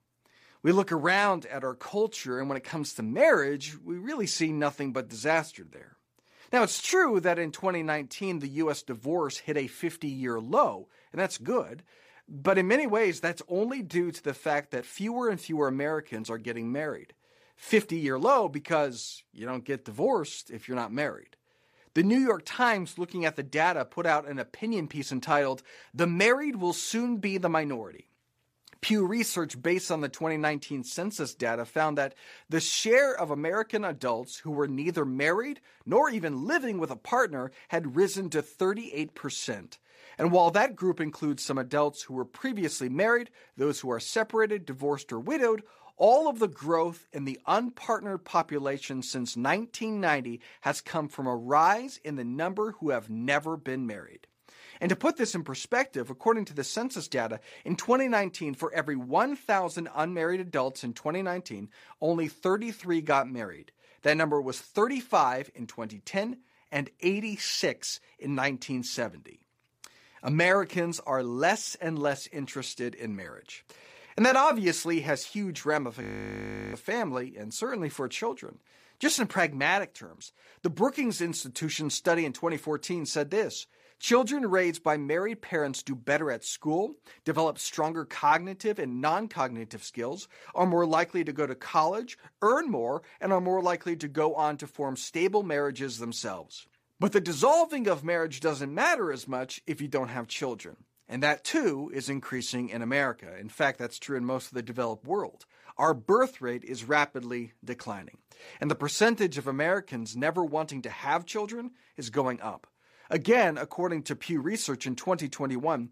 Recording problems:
audio freezing; at 1:16 for 0.5 s

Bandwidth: 15 kHz